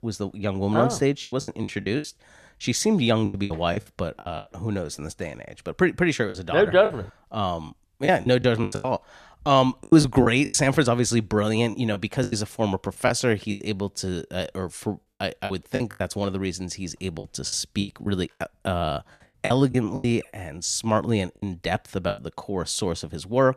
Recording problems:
choppy; very; 10% of the speech affected

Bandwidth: 14 kHz